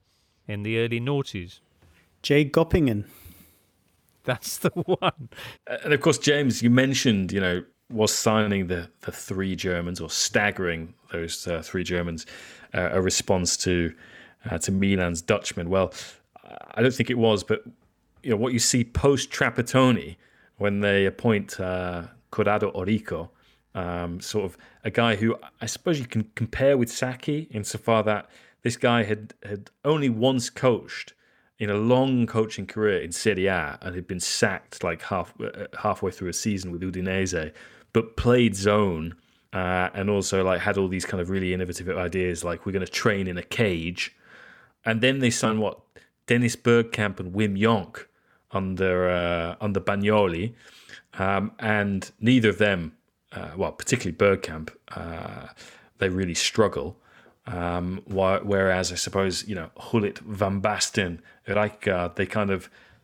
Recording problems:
none

